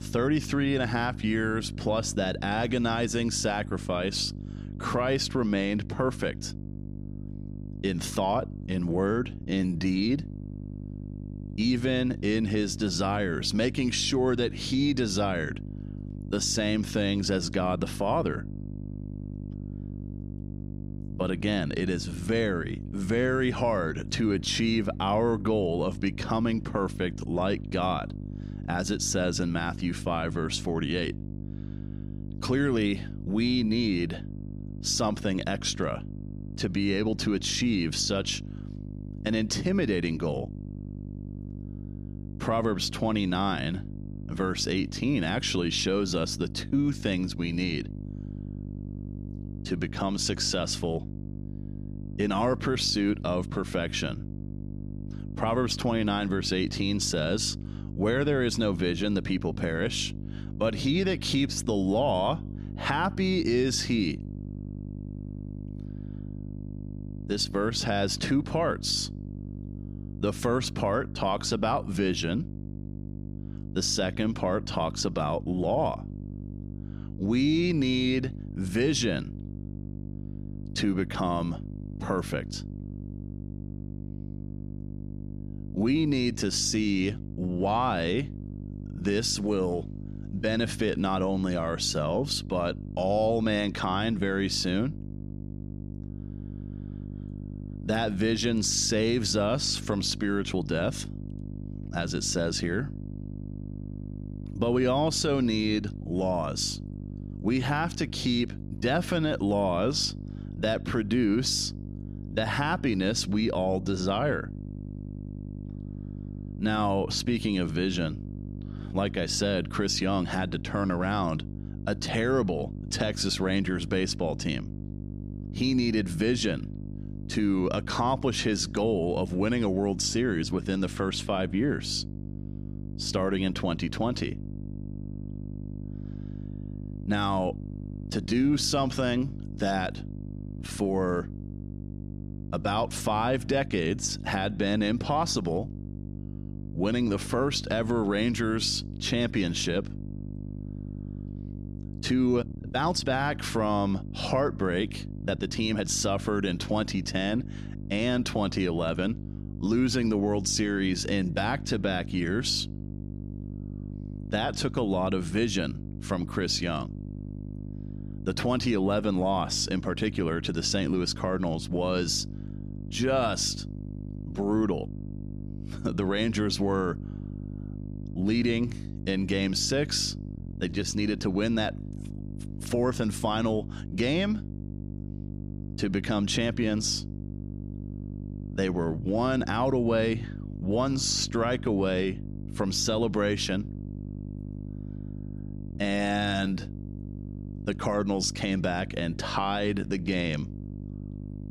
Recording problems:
electrical hum; noticeable; throughout; 50 Hz, 20 dB below the speech
uneven, jittery; strongly; from 9.5 s to 3:17

